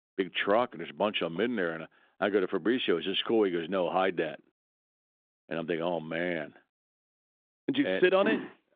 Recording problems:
phone-call audio; nothing above 3.5 kHz

